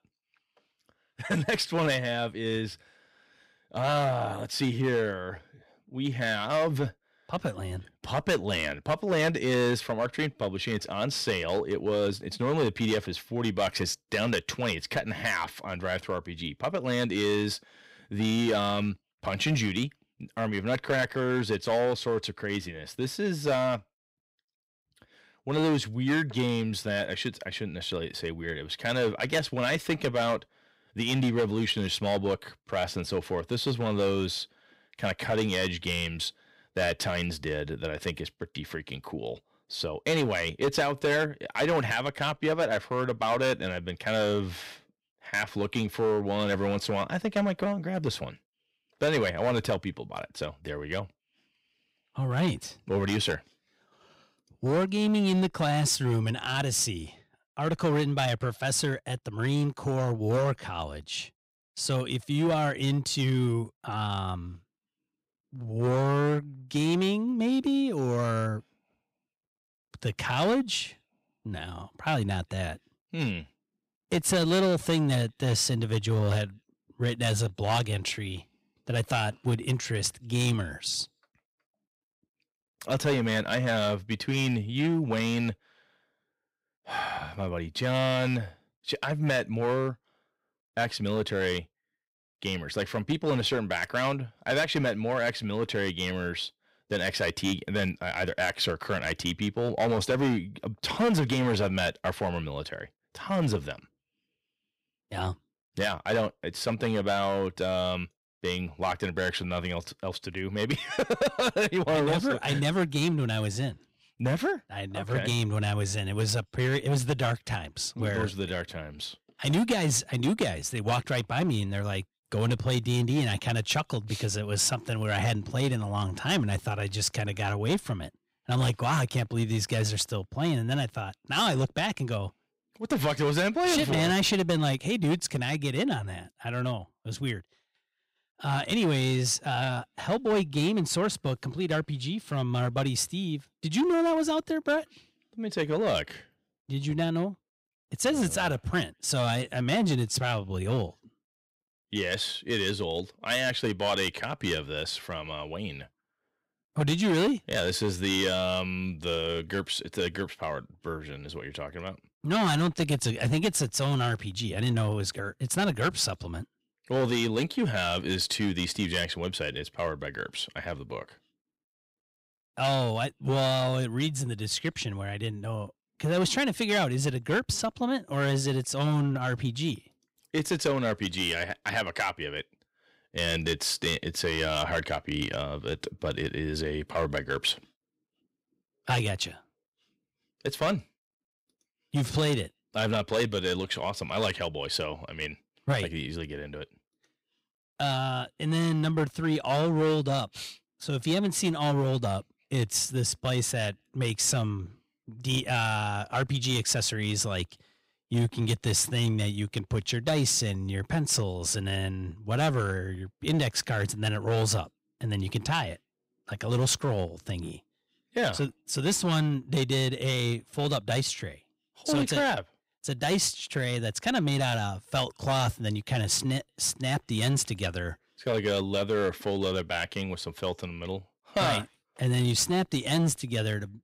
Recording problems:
distortion; slight; 6% of the sound clipped

